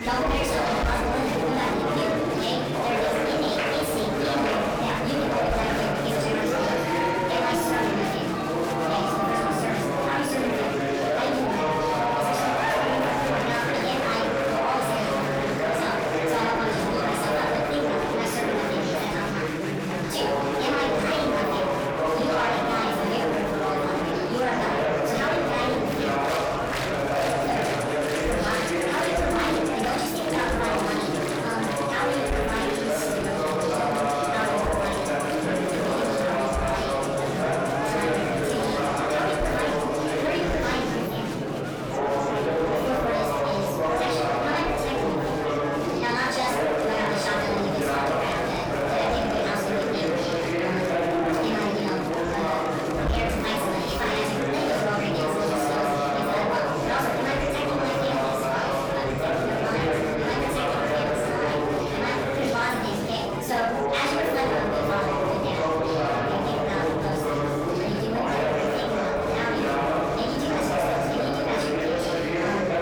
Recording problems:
off-mic speech; far
wrong speed and pitch; too fast and too high; 1.5 times normal speed
room echo; noticeable; dies away in 0.6 s
distortion; slight; 10 dB below the speech
murmuring crowd; very loud; throughout; 3 dB above the speech
background music; noticeable; throughout; 15 dB below the speech

